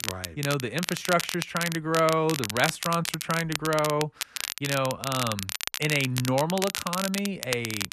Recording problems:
crackle, like an old record; loud; 5 dB below the speech

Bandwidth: 13.5 kHz